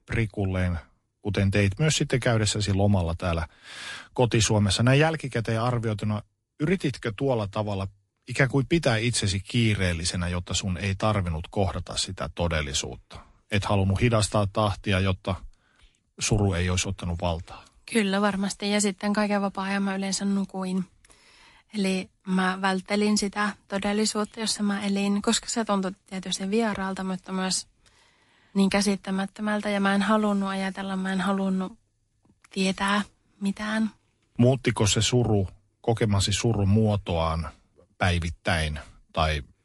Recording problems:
garbled, watery; slightly; nothing above 11 kHz

